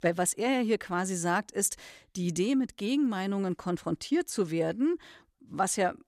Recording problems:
none

